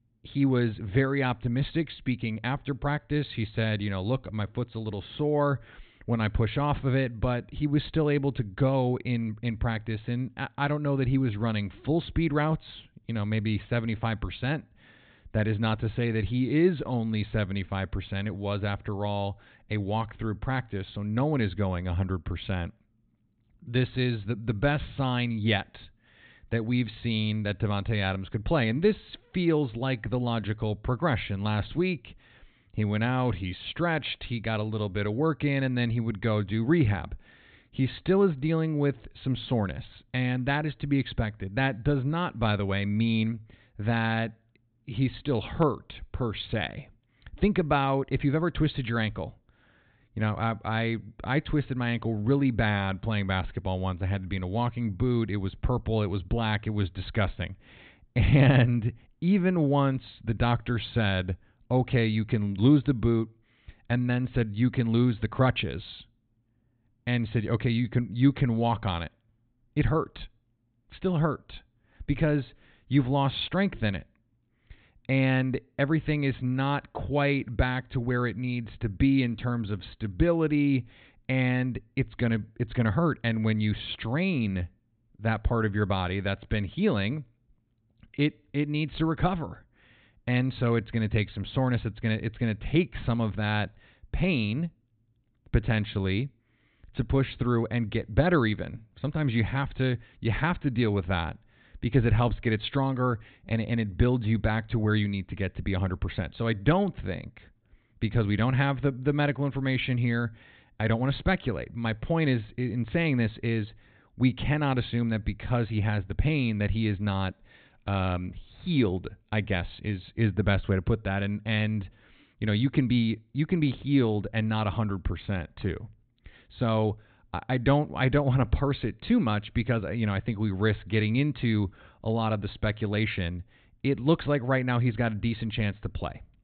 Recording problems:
high frequencies cut off; severe; nothing above 4 kHz

